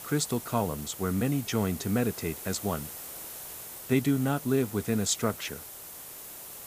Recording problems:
hiss; noticeable; throughout; 10 dB below the speech

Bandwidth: 15 kHz